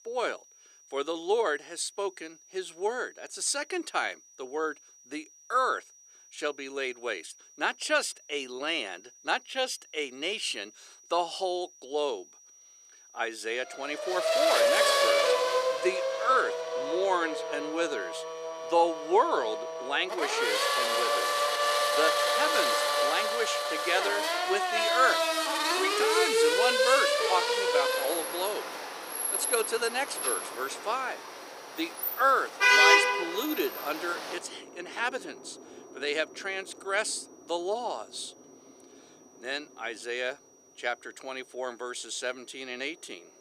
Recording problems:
thin; somewhat; fading below 400 Hz
traffic noise; very loud; from 14 s on; 4 dB above the speech
high-pitched whine; faint; throughout; 6 kHz, 25 dB below the speech

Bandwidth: 14.5 kHz